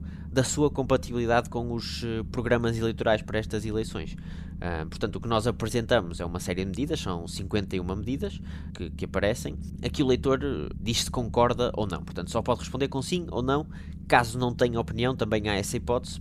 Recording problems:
low rumble; faint; throughout; 20 dB below the speech

